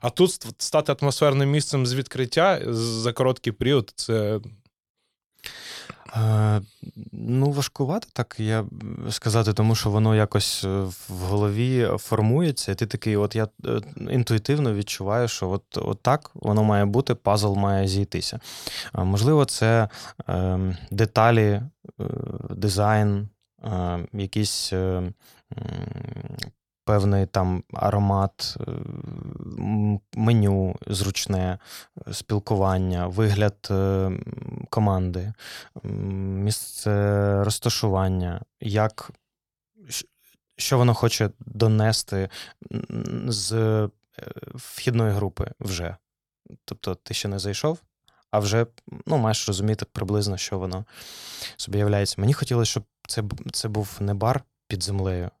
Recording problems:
none

